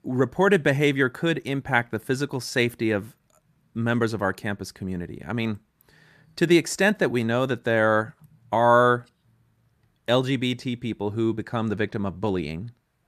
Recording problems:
none

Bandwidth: 14.5 kHz